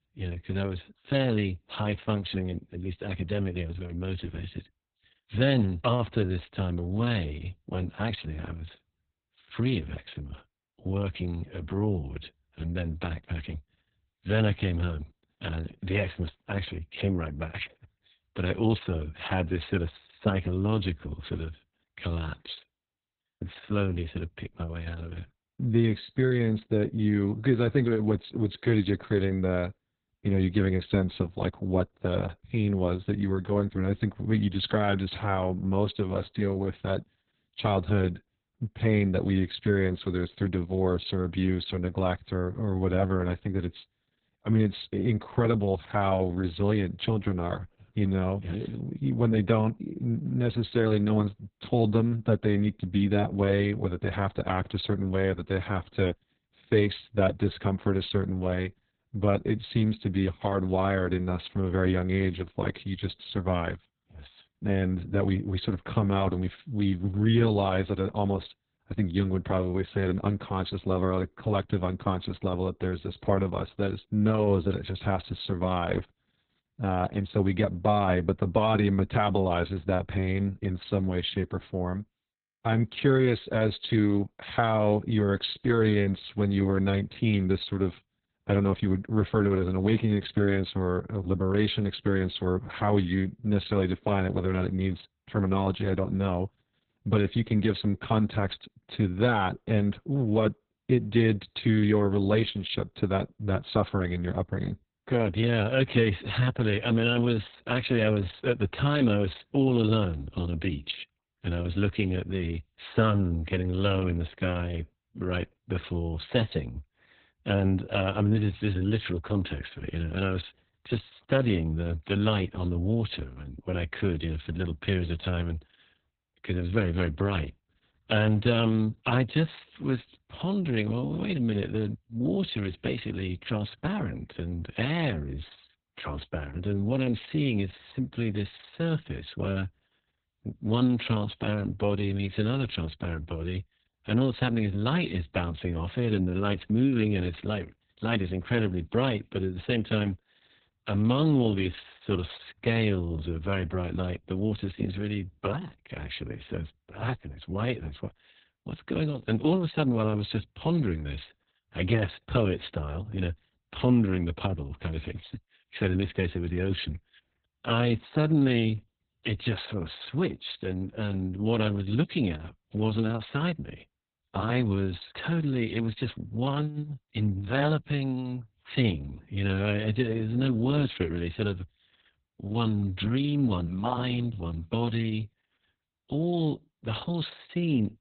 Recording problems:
garbled, watery; badly; nothing above 4 kHz

